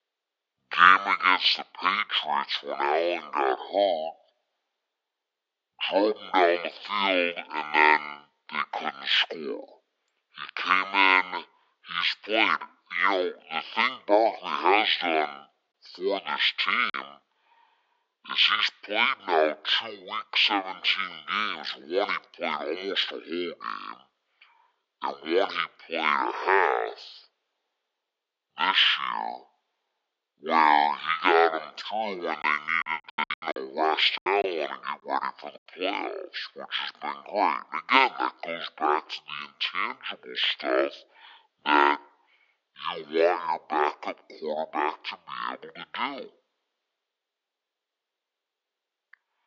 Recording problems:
thin; very; fading below 400 Hz
wrong speed and pitch; too slow and too low; 0.5 times normal speed
choppy; very; at 17 s and from 32 to 34 s; 7% of the speech affected

